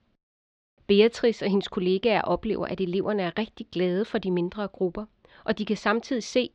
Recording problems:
muffled; slightly; fading above 4 kHz

